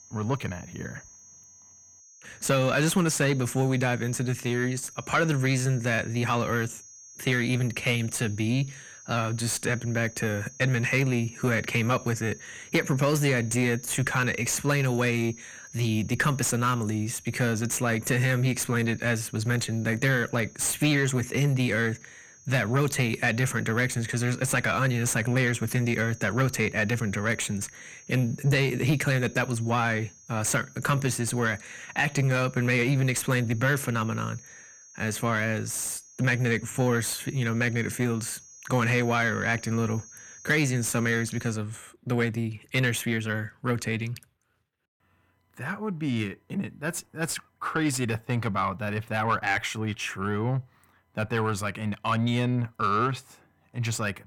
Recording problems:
distortion; slight; 10 dB below the speech
high-pitched whine; faint; until 42 s; 6.5 kHz, 20 dB below the speech

